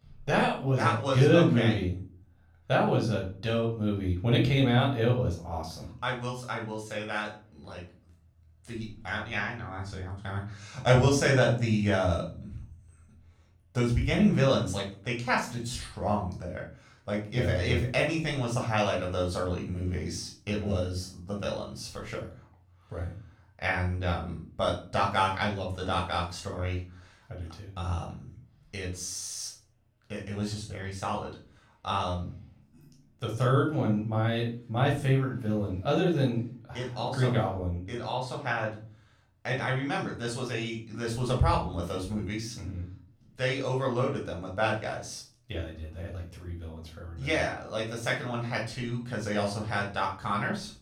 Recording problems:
off-mic speech; far
room echo; slight; dies away in 0.4 s

